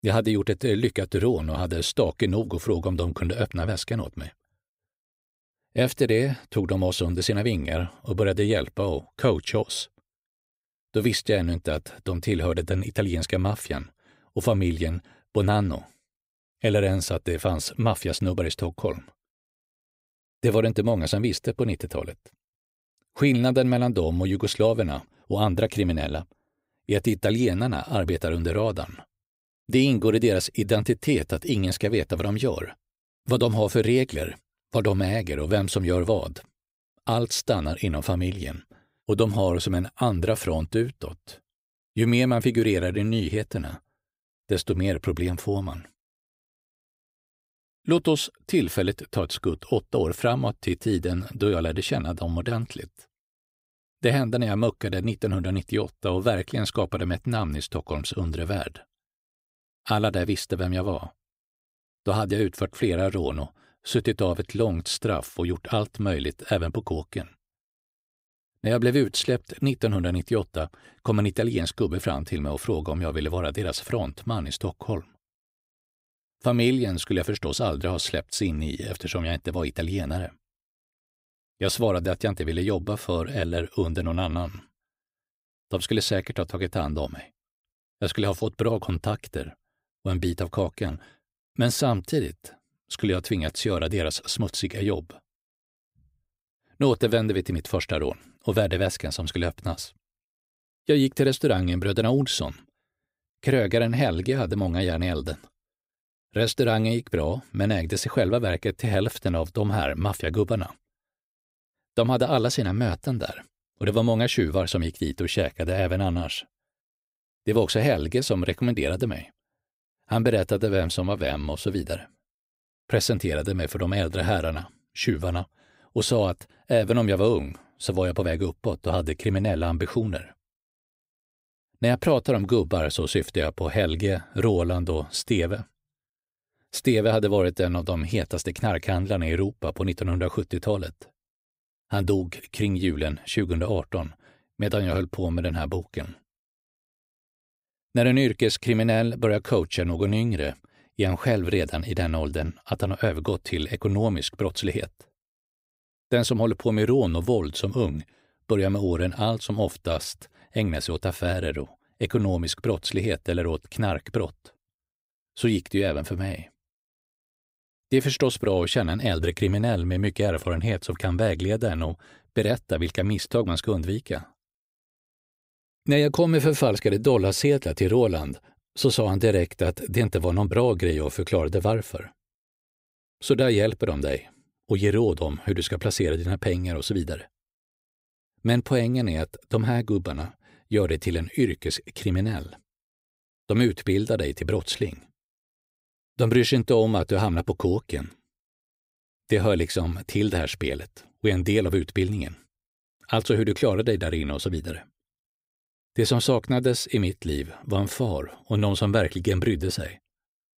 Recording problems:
none

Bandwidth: 15.5 kHz